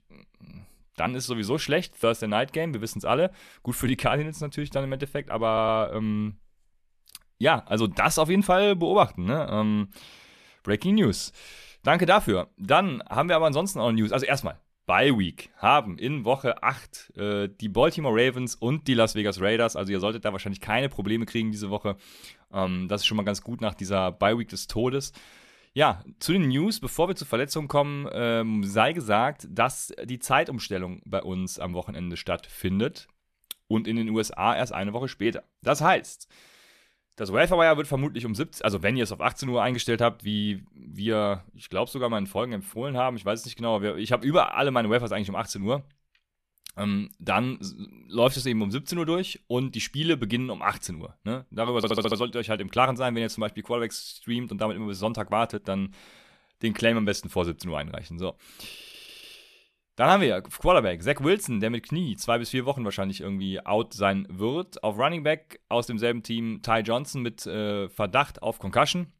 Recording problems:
audio stuttering; at 5.5 s, at 52 s and at 59 s

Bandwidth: 14 kHz